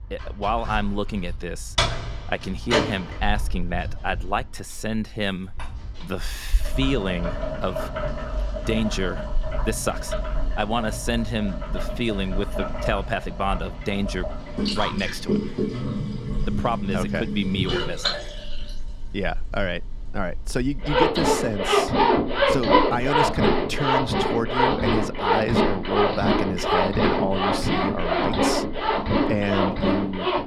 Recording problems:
household noises; very loud; throughout; 3 dB above the speech

